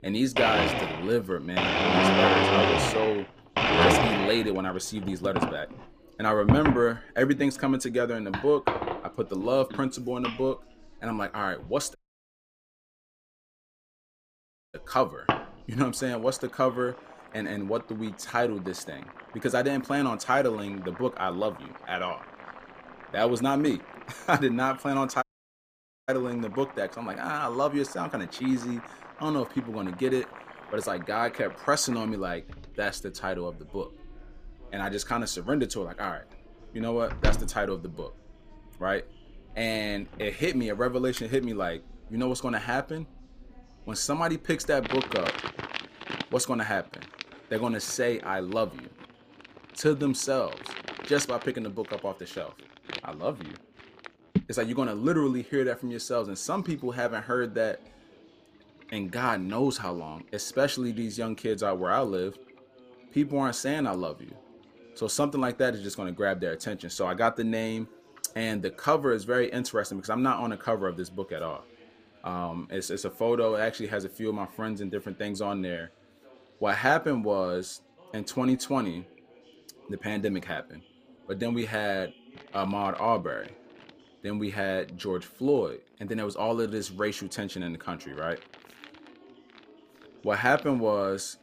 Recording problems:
household noises; loud; throughout; as loud as the speech
background chatter; faint; throughout; 4 voices, 25 dB below the speech
audio cutting out; at 12 s for 3 s and at 25 s for 1 s

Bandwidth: 15 kHz